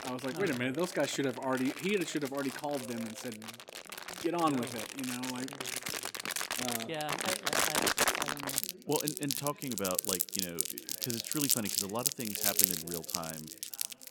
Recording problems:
household noises; very loud; throughout; 3 dB above the speech
background chatter; noticeable; throughout; 3 voices, 20 dB below the speech

